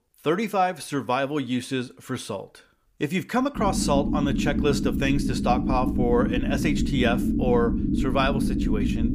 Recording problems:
low rumble; loud; from 3.5 s on; 5 dB below the speech

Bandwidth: 15 kHz